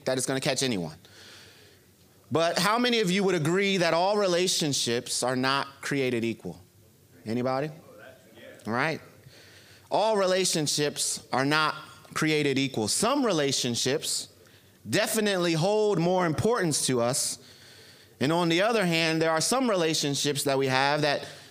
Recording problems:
squashed, flat; heavily

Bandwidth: 15 kHz